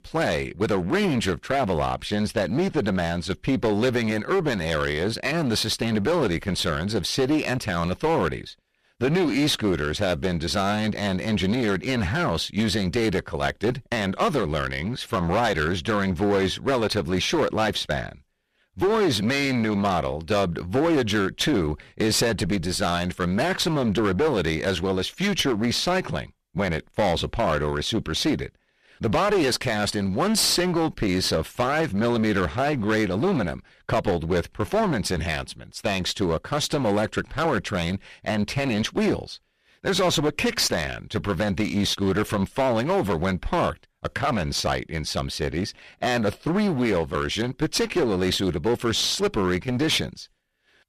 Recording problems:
distortion; heavy; 12% of the sound clipped

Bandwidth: 14.5 kHz